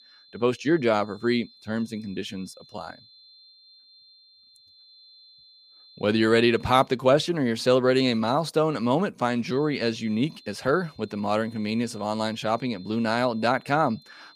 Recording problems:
high-pitched whine; faint; until 7 s and from 9.5 s on; 4 kHz, 25 dB below the speech

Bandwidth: 15 kHz